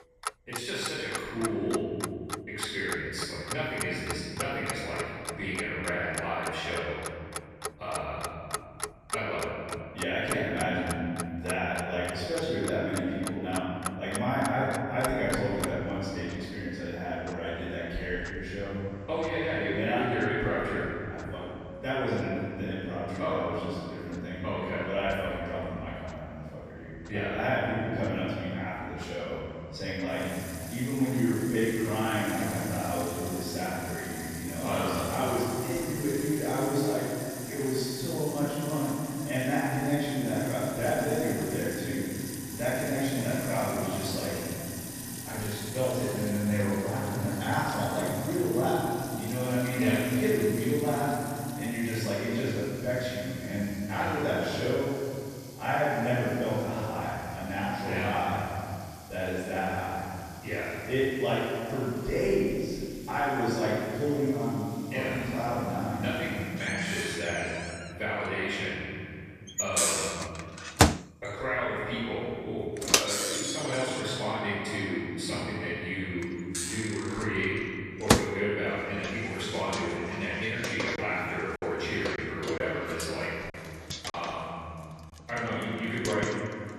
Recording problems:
room echo; strong; dies away in 2.4 s
off-mic speech; far
household noises; loud; throughout; 5 dB below the speech
choppy; very; from 1:21 to 1:24; 5% of the speech affected

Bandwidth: 14.5 kHz